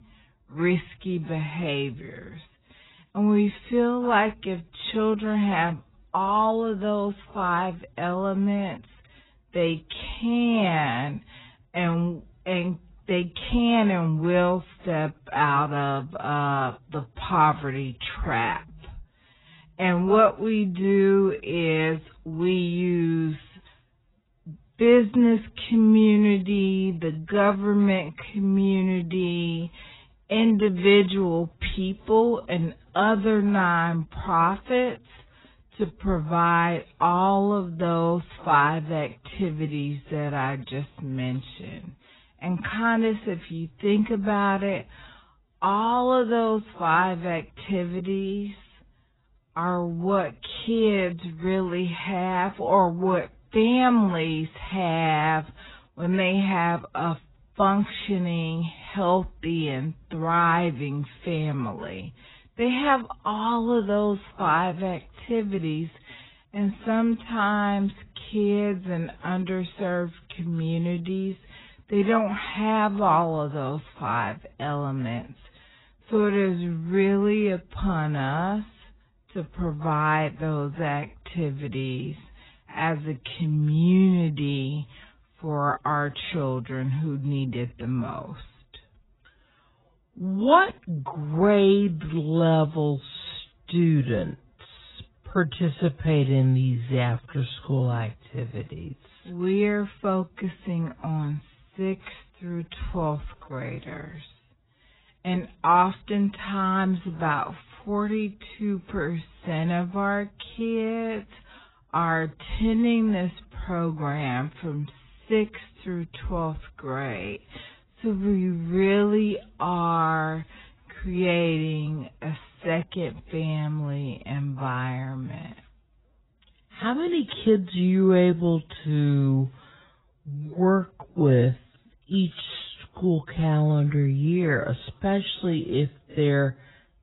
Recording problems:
garbled, watery; badly; nothing above 4 kHz
wrong speed, natural pitch; too slow; 0.5 times normal speed

